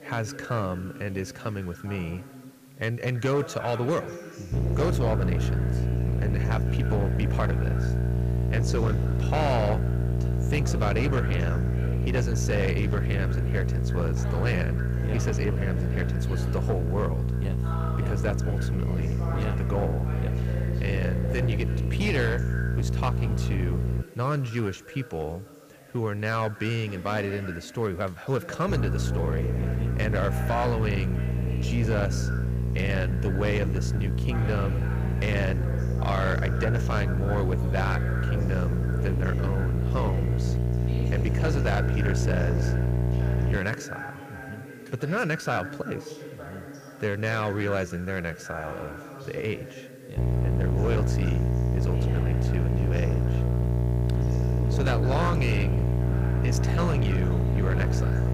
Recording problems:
echo of what is said; noticeable; throughout; 170 ms later, 15 dB below the speech
distortion; slight; 13% of the sound clipped
electrical hum; loud; from 4.5 to 24 s, from 29 to 44 s and from 50 s on; 60 Hz, 5 dB below the speech
voice in the background; noticeable; throughout; 10 dB below the speech
hiss; faint; throughout; 25 dB below the speech

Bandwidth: 15 kHz